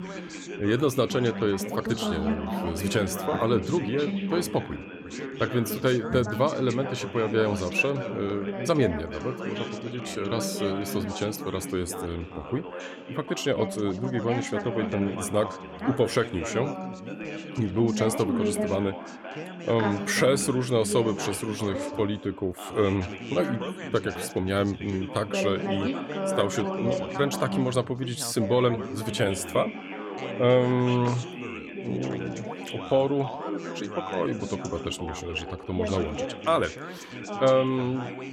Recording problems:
background chatter; loud; throughout; 3 voices, 6 dB below the speech

